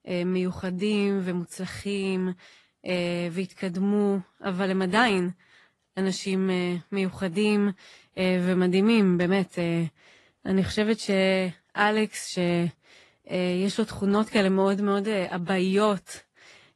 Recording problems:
garbled, watery; slightly; nothing above 11.5 kHz

